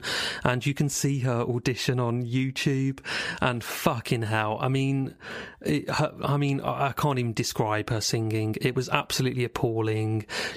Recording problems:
squashed, flat; heavily

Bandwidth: 15 kHz